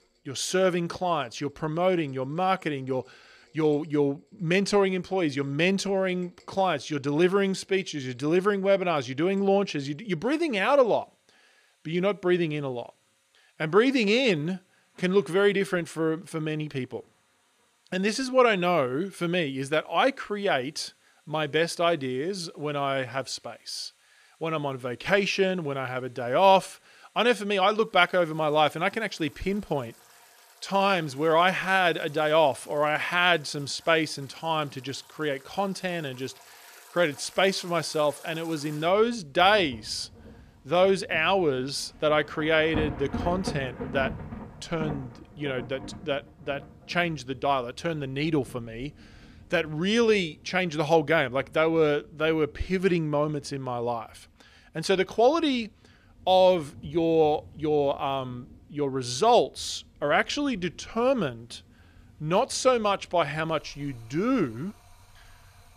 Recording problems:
rain or running water; noticeable; throughout; 20 dB below the speech

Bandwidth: 14.5 kHz